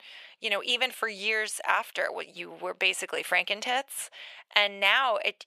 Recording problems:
thin; very; fading below 750 Hz

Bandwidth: 14.5 kHz